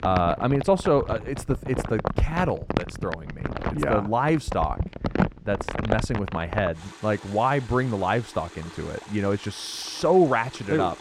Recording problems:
muffled; slightly; fading above 2.5 kHz
household noises; loud; throughout; 7 dB below the speech

